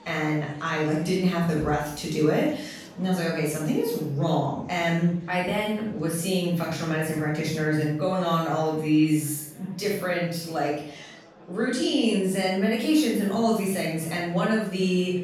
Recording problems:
off-mic speech; far
room echo; noticeable; dies away in 0.5 s
murmuring crowd; faint; throughout; 25 dB below the speech

